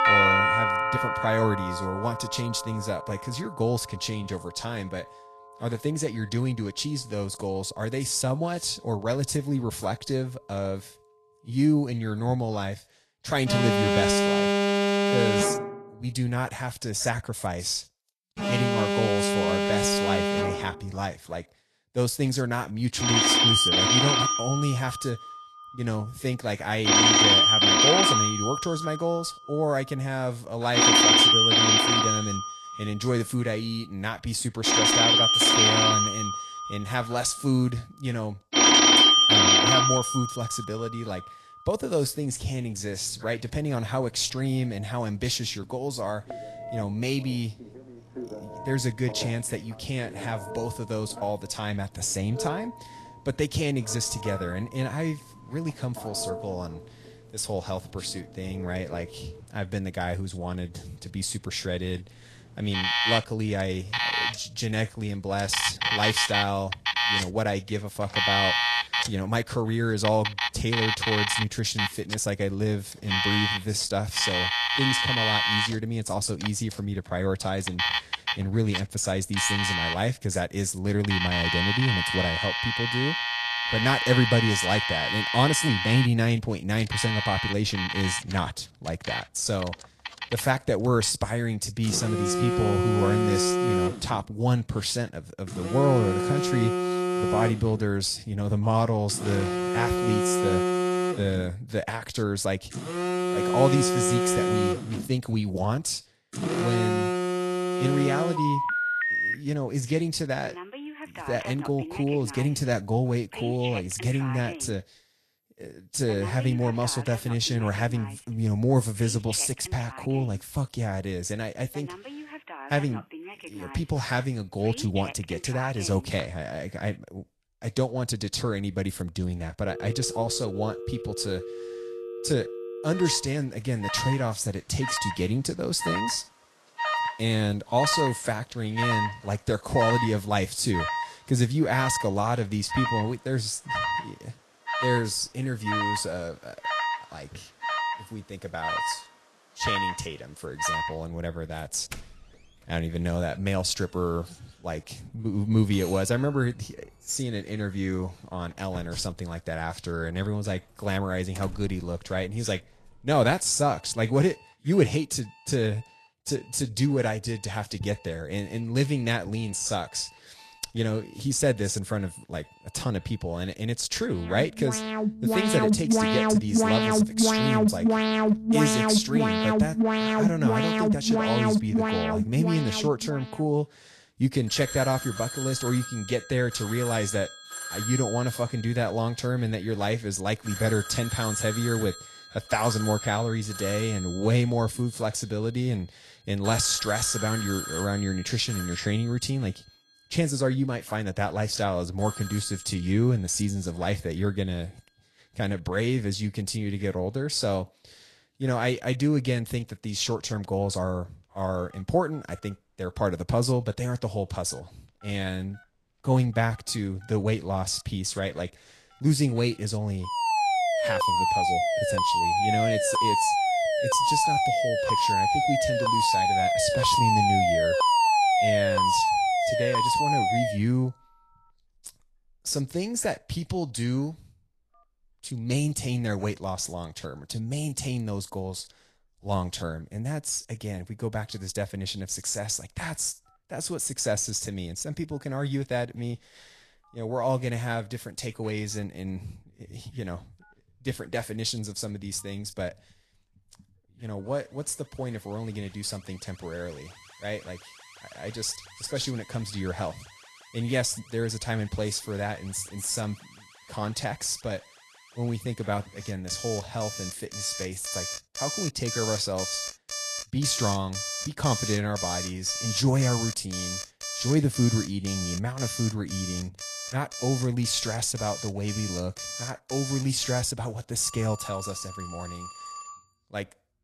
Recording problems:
garbled, watery; slightly
alarms or sirens; very loud; throughout; 4 dB above the speech

